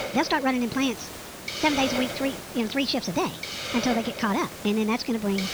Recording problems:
wrong speed and pitch; too fast and too high; 1.5 times normal speed
high frequencies cut off; noticeable; nothing above 6 kHz
hiss; loud; throughout; 7 dB below the speech

